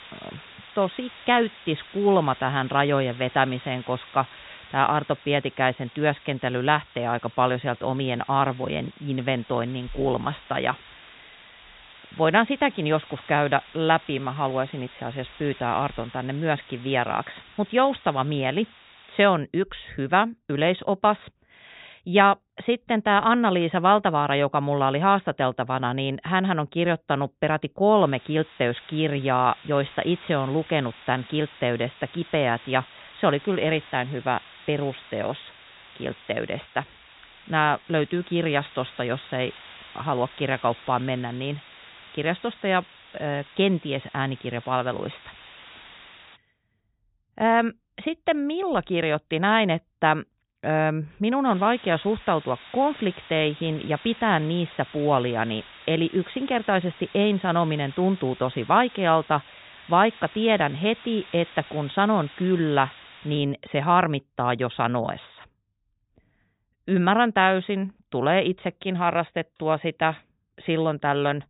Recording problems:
high frequencies cut off; severe; nothing above 4 kHz
hiss; faint; until 19 s, from 28 to 46 s and from 51 s to 1:03; 20 dB below the speech

